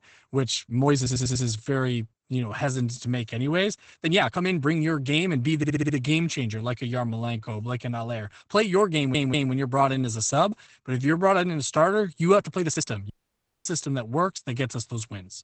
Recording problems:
garbled, watery; badly; nothing above 8 kHz
uneven, jittery; strongly; from 0.5 to 13 s
audio stuttering; at 1 s, at 5.5 s and at 9 s
audio cutting out; at 13 s for 0.5 s

